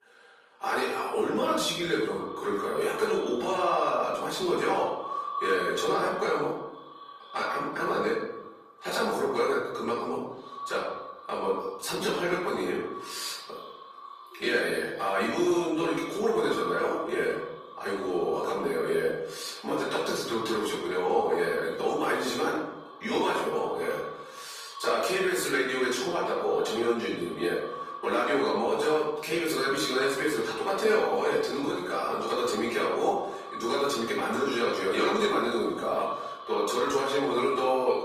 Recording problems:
off-mic speech; far
echo of what is said; noticeable; throughout; 480 ms later, 15 dB below the speech
room echo; noticeable; dies away in 0.8 s
thin; somewhat; fading below 400 Hz
garbled, watery; slightly; nothing above 14.5 kHz

